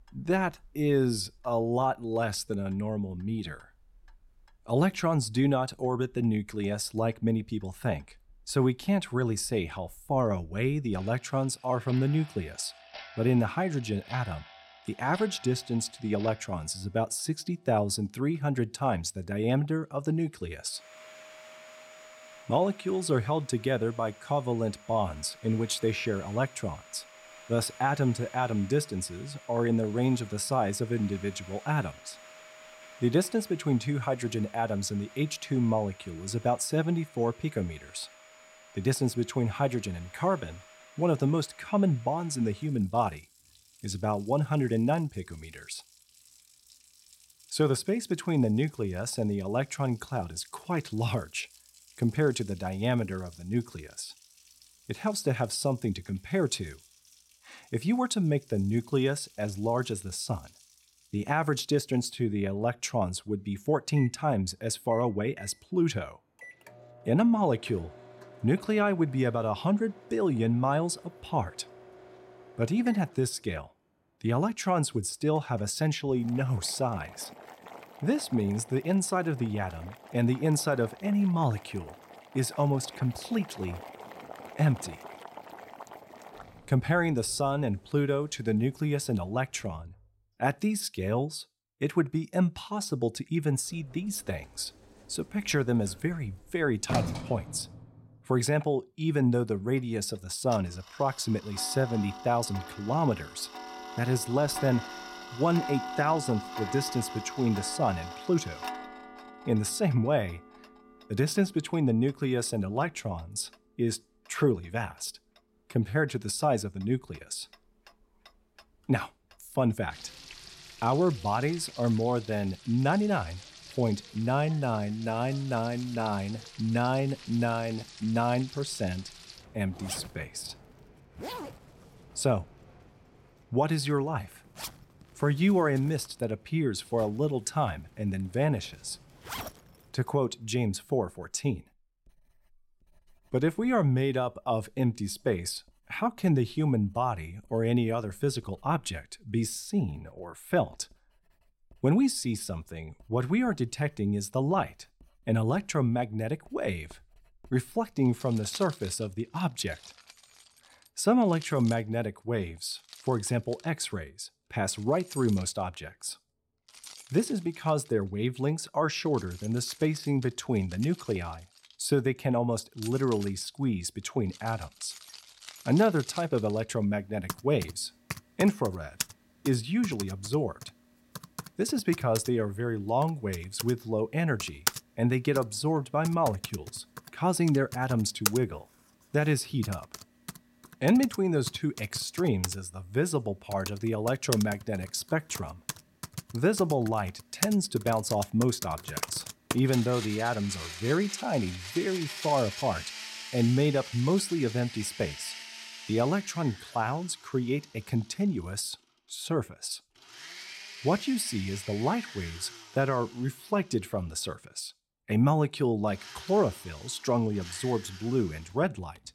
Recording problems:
household noises; noticeable; throughout; 15 dB below the speech

